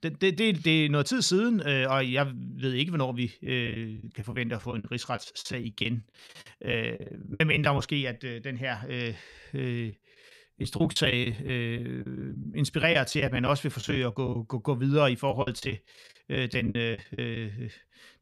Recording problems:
choppy; very; from 3.5 to 8 s, from 10 to 14 s and from 15 to 17 s; 17% of the speech affected

